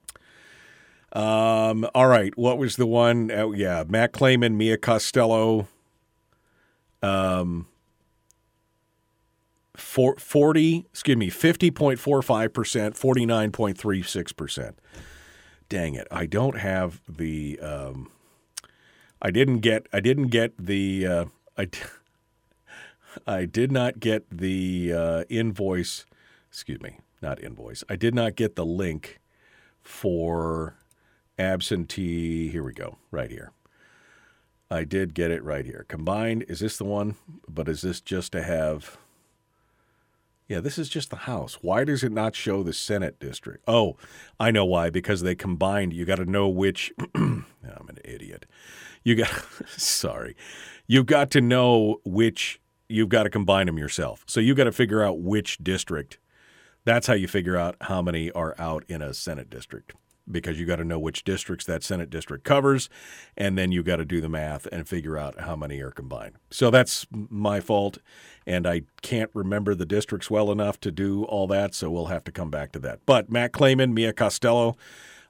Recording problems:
none

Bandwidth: 17.5 kHz